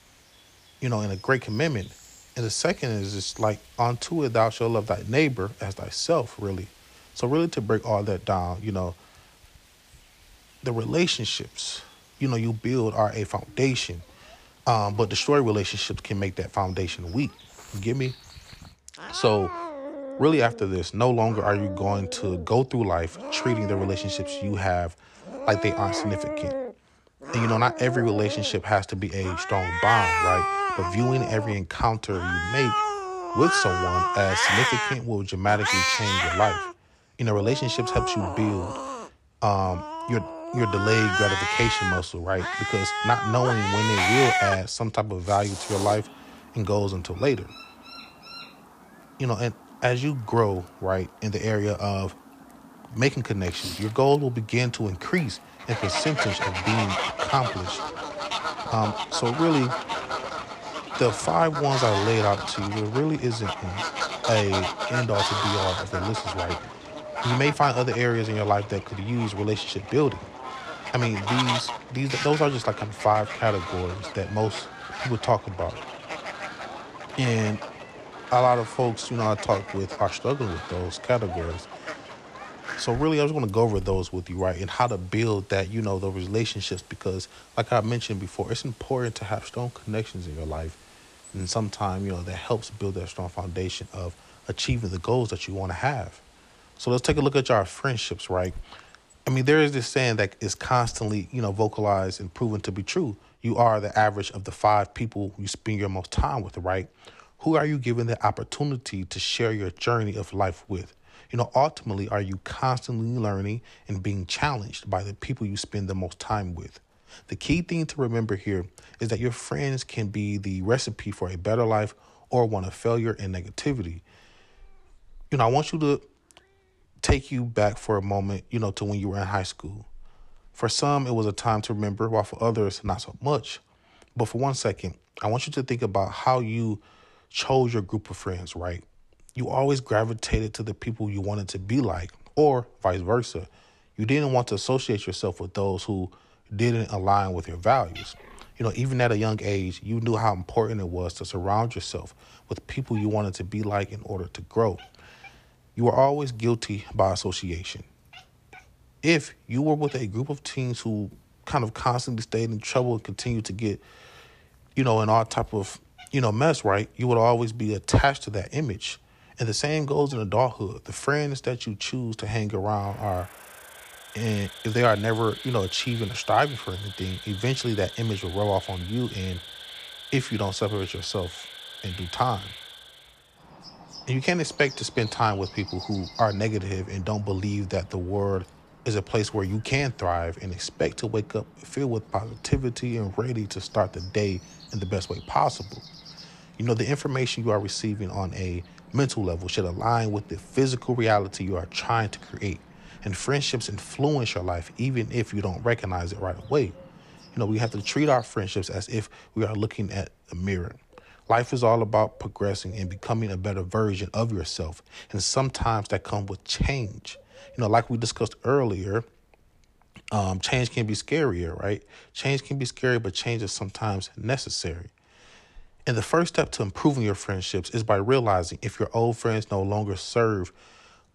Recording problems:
animal sounds; loud; throughout; 4 dB below the speech

